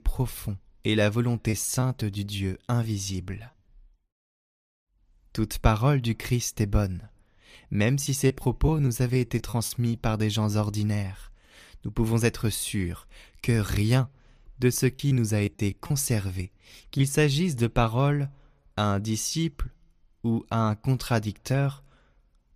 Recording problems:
choppy; very; from 1.5 to 3.5 s, from 8 to 9.5 s and from 15 to 17 s; 9% of the speech affected

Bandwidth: 15 kHz